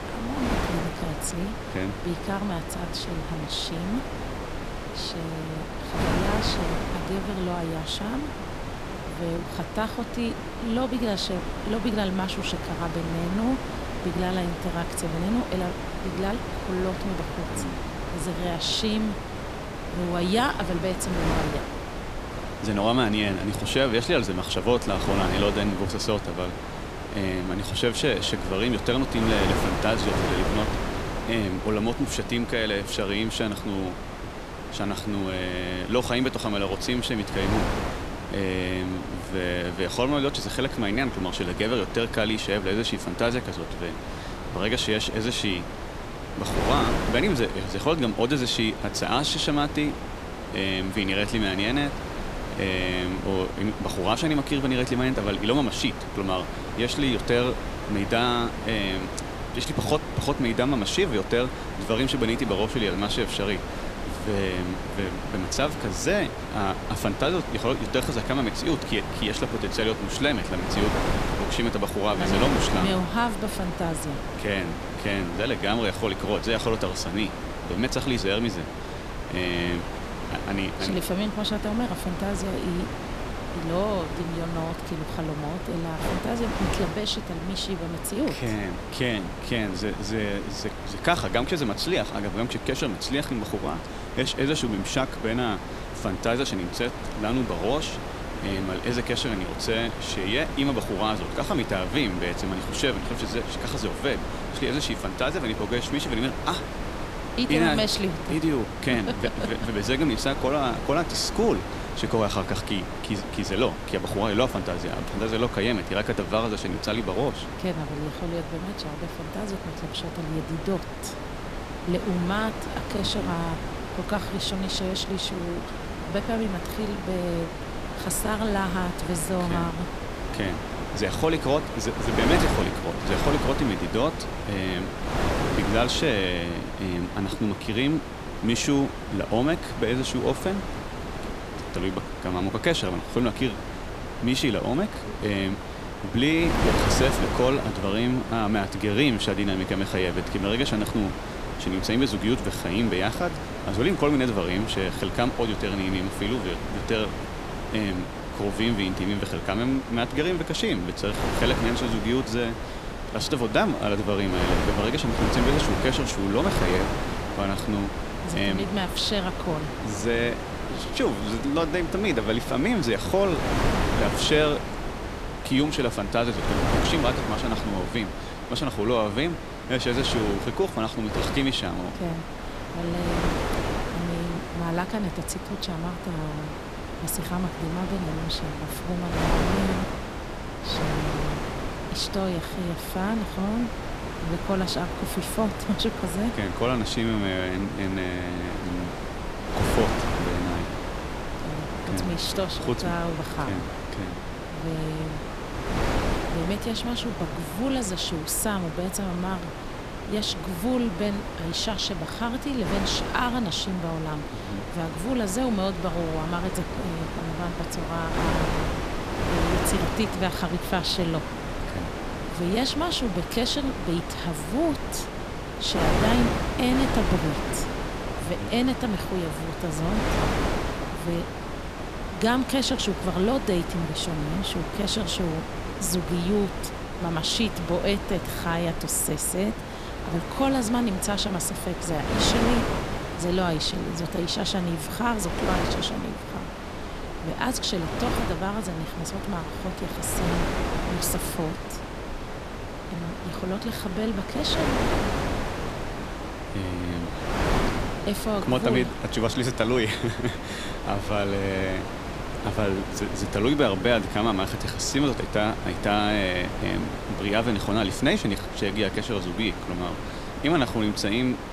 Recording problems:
wind noise on the microphone; heavy; 4 dB below the speech

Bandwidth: 14.5 kHz